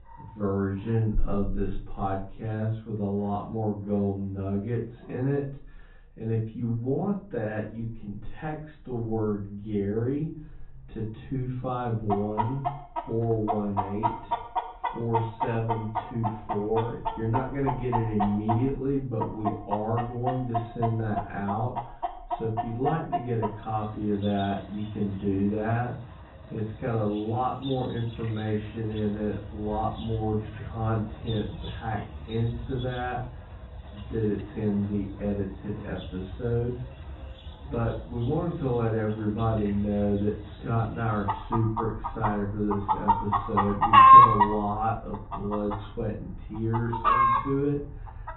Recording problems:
off-mic speech; far
high frequencies cut off; severe; nothing above 4 kHz
wrong speed, natural pitch; too slow; 0.6 times normal speed
room echo; slight; dies away in 0.3 s
muffled; very slightly; fading above 2 kHz
animal sounds; very loud; throughout; 4 dB above the speech

